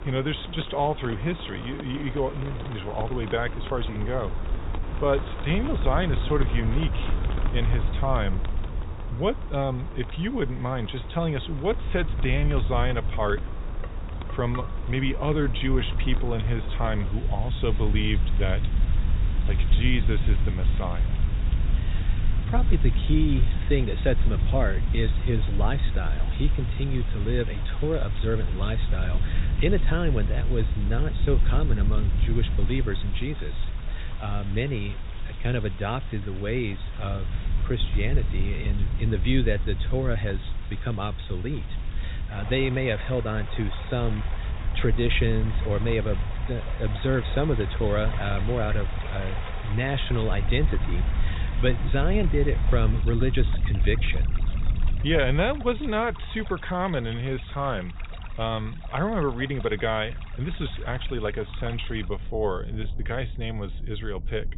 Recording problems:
high frequencies cut off; severe; nothing above 4 kHz
rain or running water; noticeable; throughout; 15 dB below the speech
low rumble; noticeable; throughout; 15 dB below the speech
clattering dishes; faint; from 13 to 15 s; peak 10 dB below the speech

